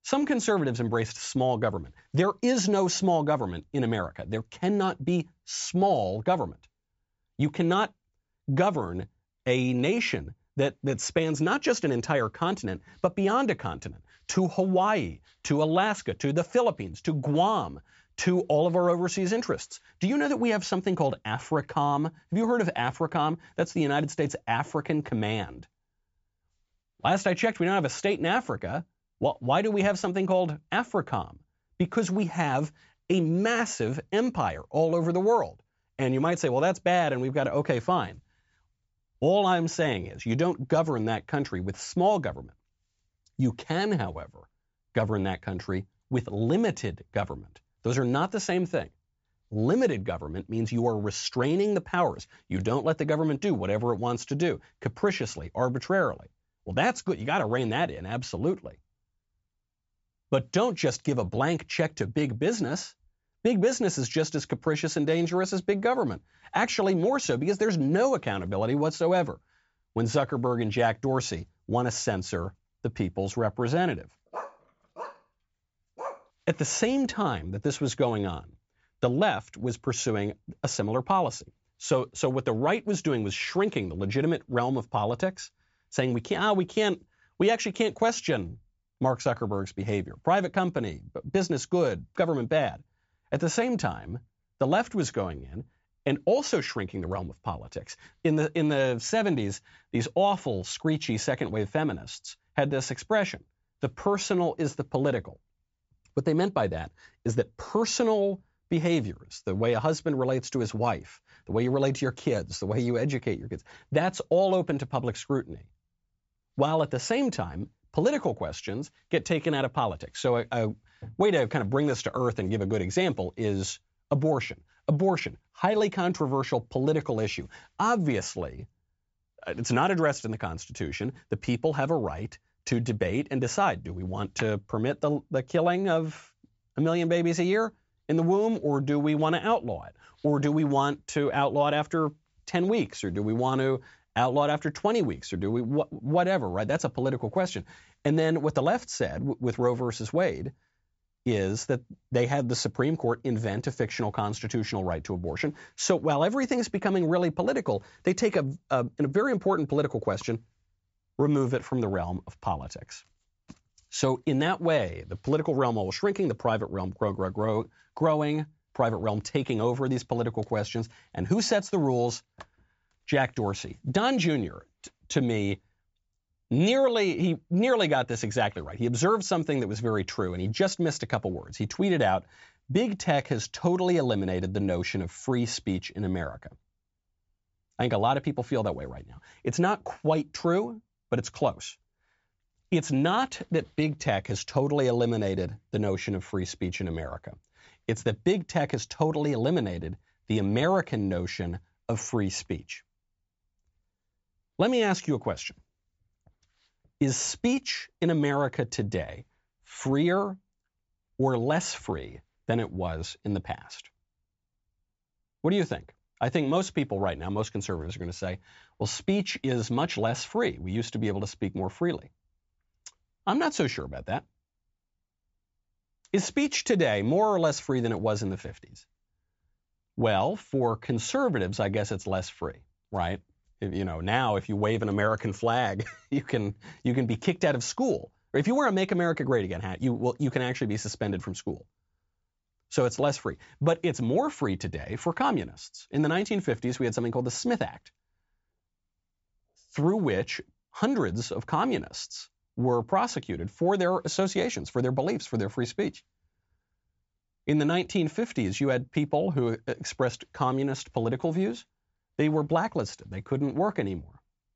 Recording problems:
high frequencies cut off; noticeable; nothing above 8 kHz
dog barking; faint; from 1:14 to 1:16; peak 10 dB below the speech

